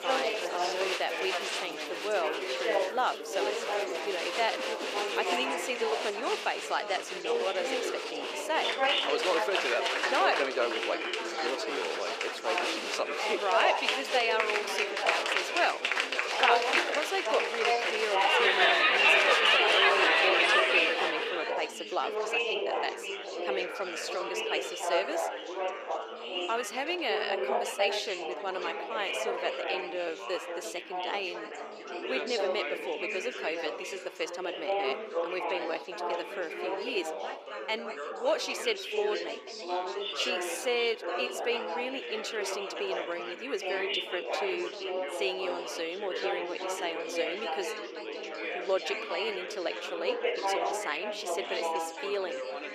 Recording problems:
thin; very; fading below 400 Hz
chatter from many people; very loud; throughout; 4 dB above the speech
background music; faint; until 24 s; 20 dB below the speech

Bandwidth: 15 kHz